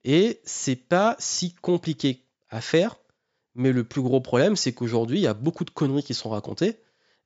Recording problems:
high frequencies cut off; noticeable; nothing above 7.5 kHz

